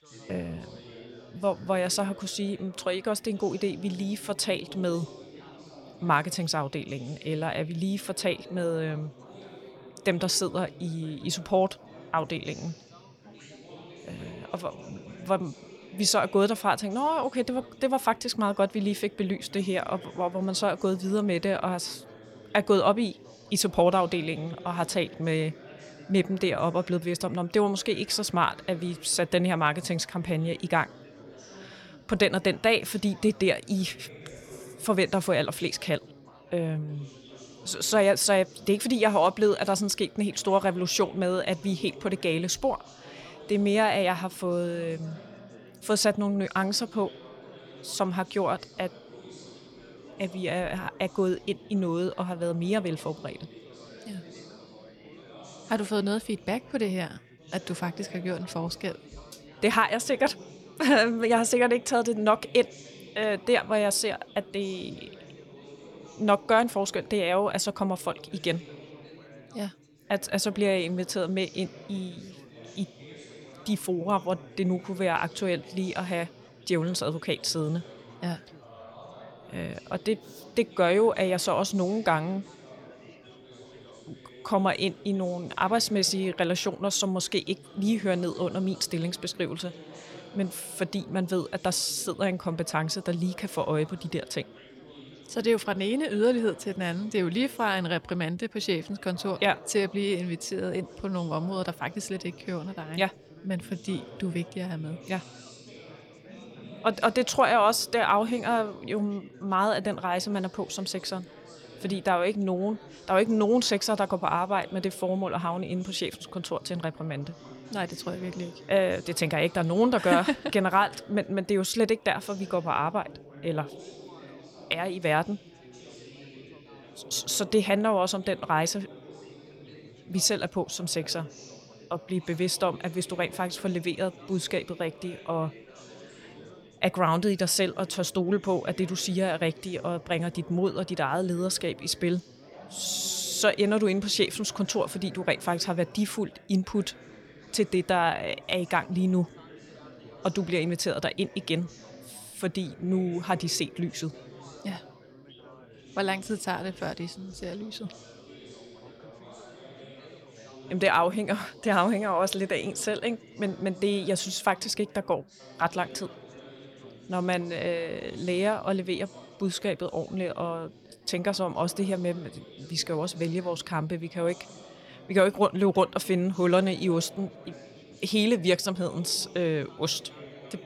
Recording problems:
chatter from many people; noticeable; throughout; 20 dB below the speech

